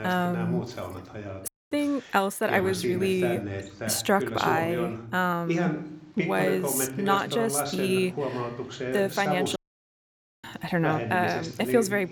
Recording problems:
voice in the background; loud; throughout; 5 dB below the speech
audio cutting out; at 1.5 s and at 9.5 s for 1 s

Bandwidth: 18 kHz